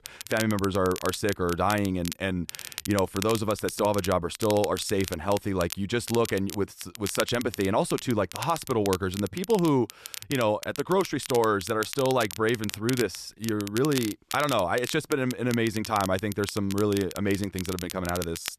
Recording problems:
crackle, like an old record; noticeable; 10 dB below the speech

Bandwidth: 14 kHz